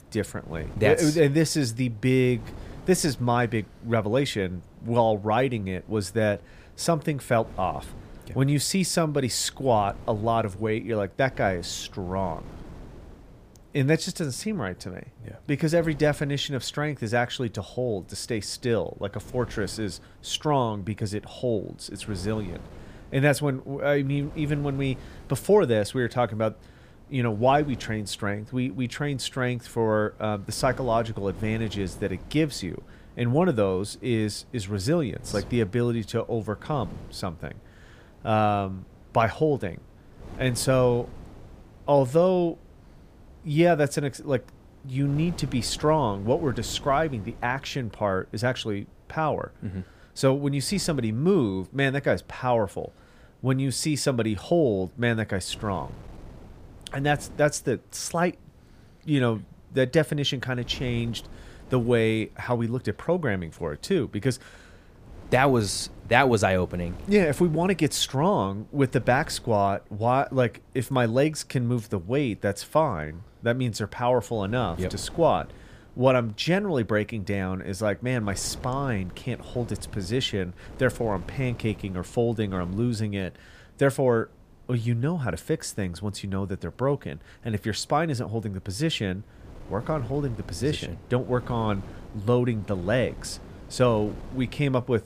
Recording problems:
wind noise on the microphone; occasional gusts; 25 dB below the speech

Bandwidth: 15 kHz